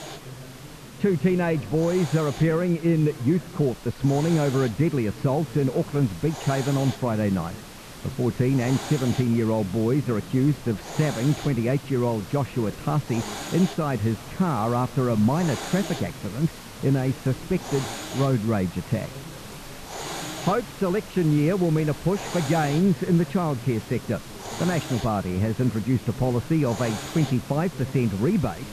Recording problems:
muffled; very; fading above 2.5 kHz
background chatter; noticeable; throughout; 4 voices, 20 dB below the speech
hiss; noticeable; throughout; 15 dB below the speech

